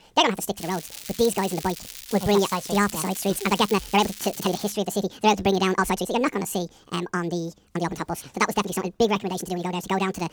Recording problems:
wrong speed and pitch; too fast and too high; 1.7 times normal speed
crackling; noticeable; from 0.5 to 4.5 s; 10 dB below the speech
uneven, jittery; strongly; from 1 to 9.5 s

